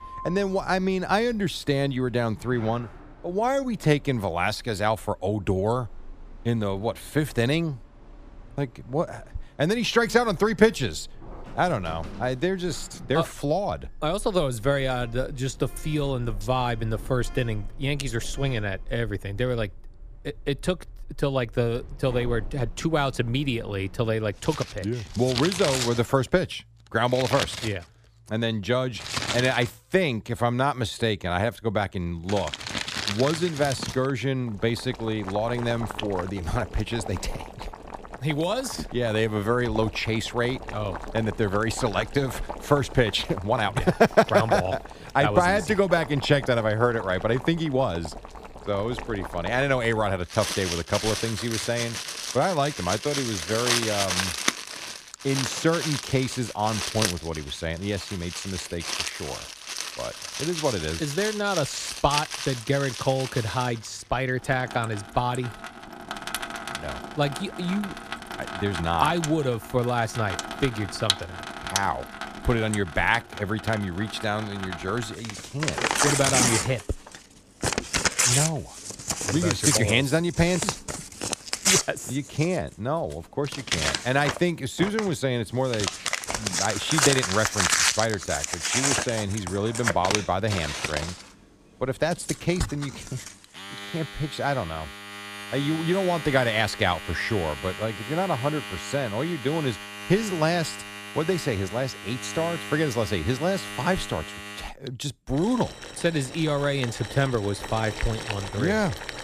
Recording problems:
household noises; loud; throughout; 4 dB below the speech

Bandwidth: 14.5 kHz